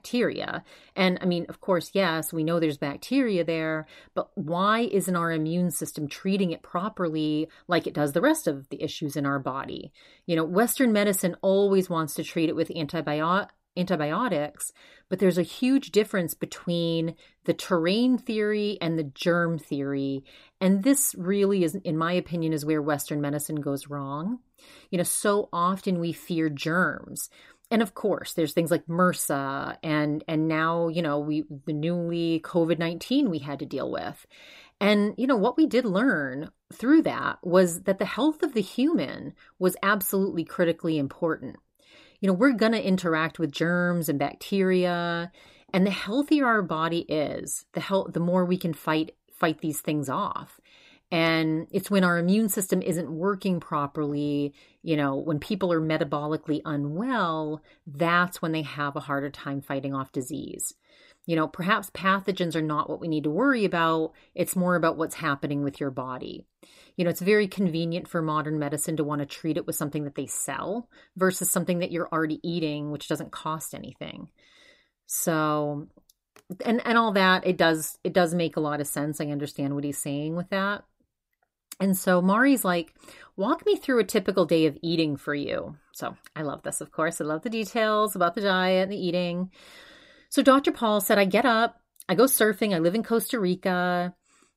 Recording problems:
none

